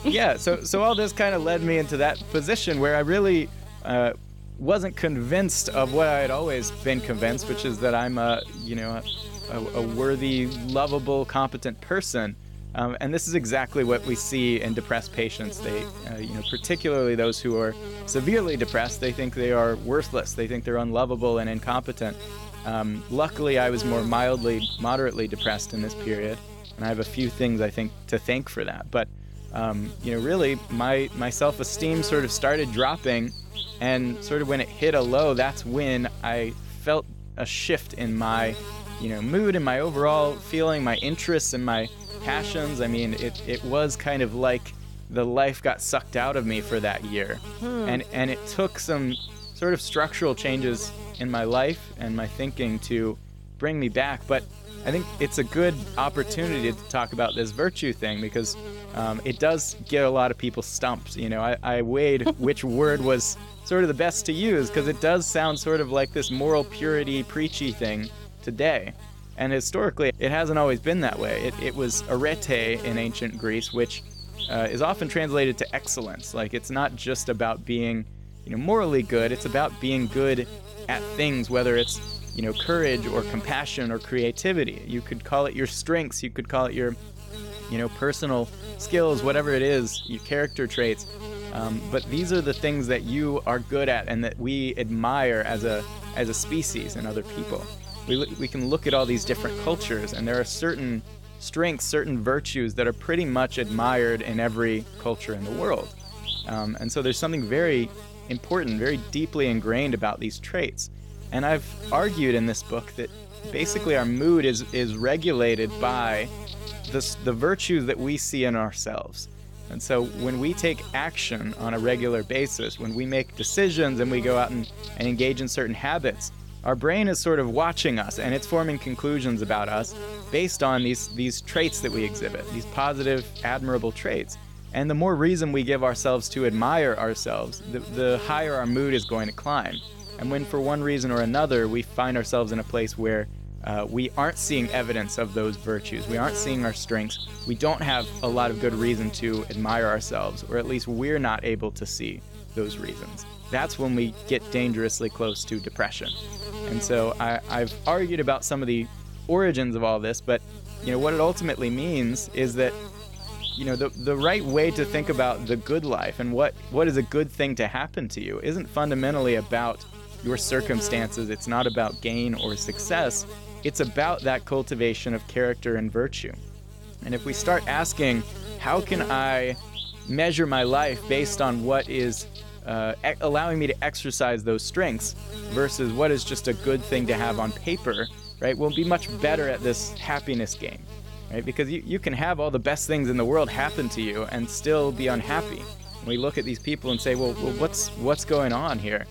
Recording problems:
electrical hum; noticeable; throughout; 50 Hz, 10 dB below the speech

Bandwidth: 17 kHz